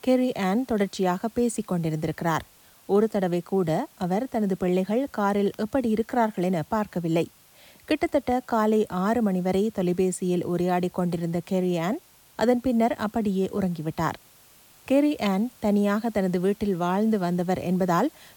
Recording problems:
hiss; faint; throughout; 25 dB below the speech

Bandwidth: 18 kHz